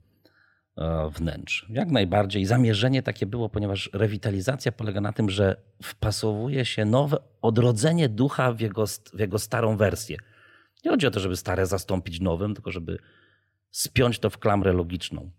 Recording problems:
none

